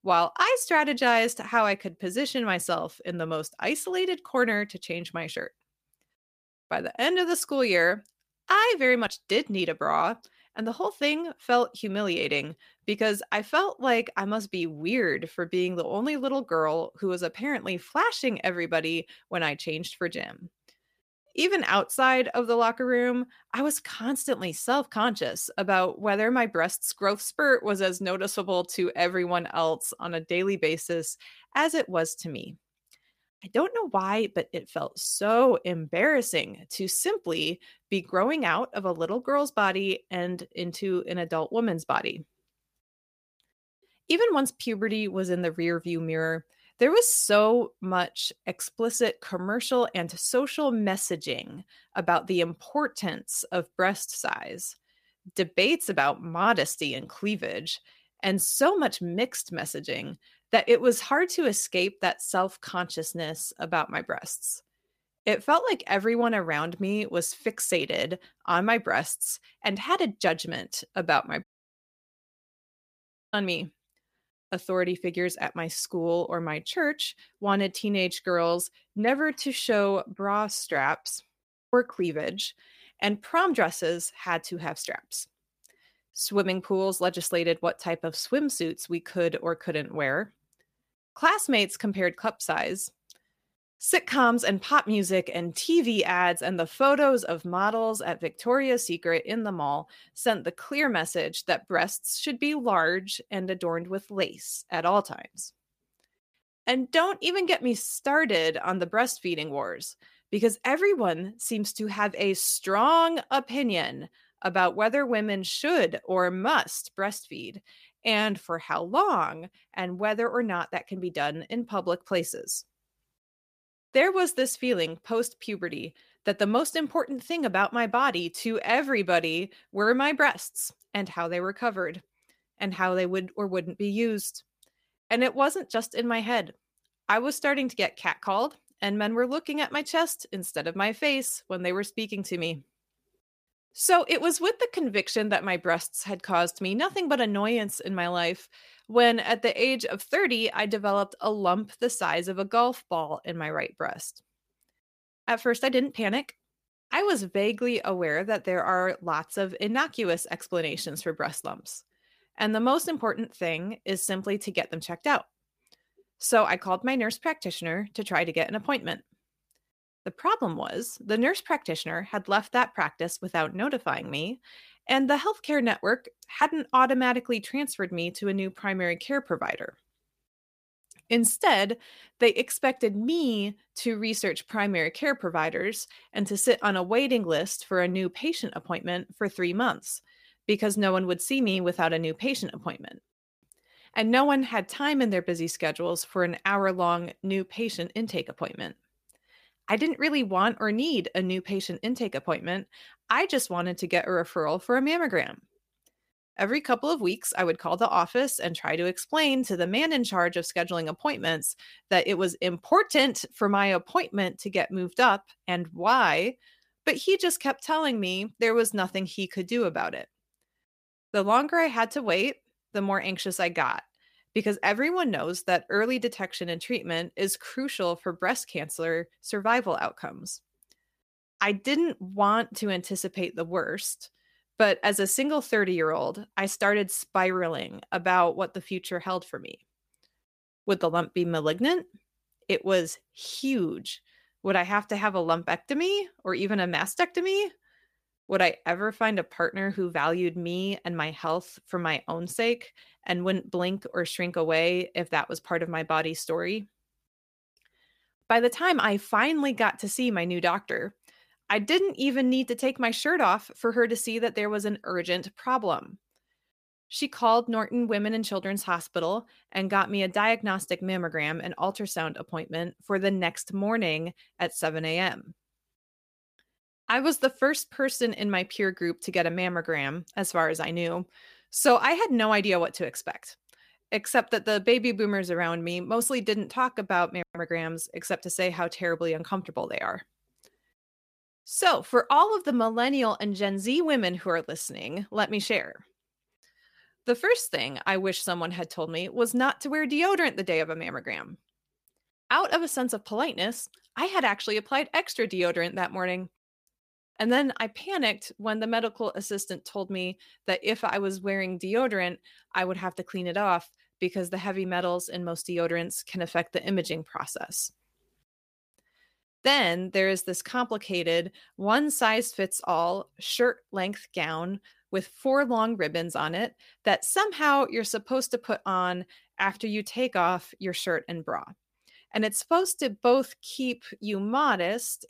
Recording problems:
audio cutting out; at 1:11 for 2 s

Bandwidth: 15 kHz